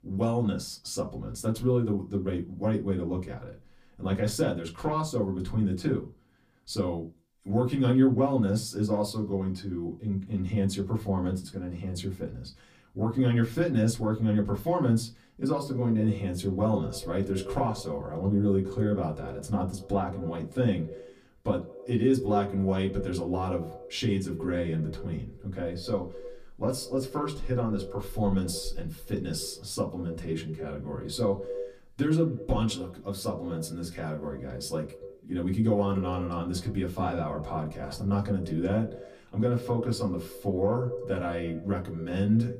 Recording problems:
off-mic speech; far
echo of what is said; noticeable; from 16 s on; 100 ms later, 15 dB below the speech
room echo; very slight; dies away in 0.2 s

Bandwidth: 15 kHz